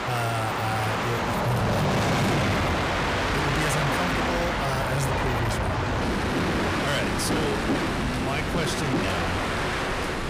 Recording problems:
distortion; heavy; 8 dB below the speech
train or aircraft noise; very loud; throughout; 4 dB above the speech
household noises; noticeable; from 4 s on; 15 dB below the speech

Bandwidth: 15 kHz